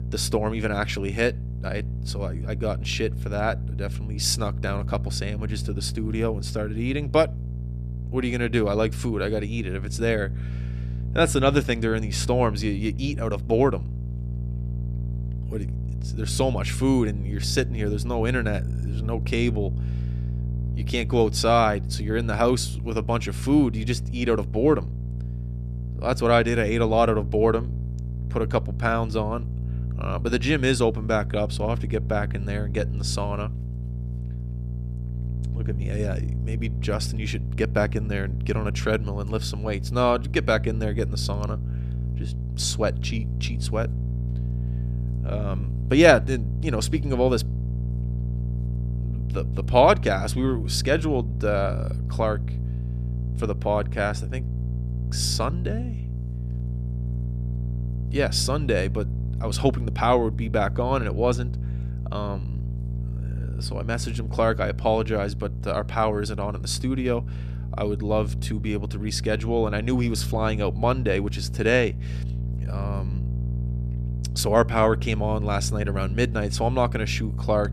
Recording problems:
electrical hum; noticeable; throughout; 60 Hz, 15 dB below the speech

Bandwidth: 14 kHz